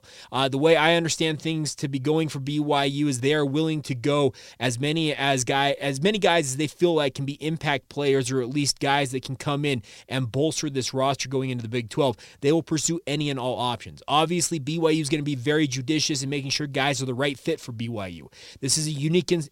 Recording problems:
none

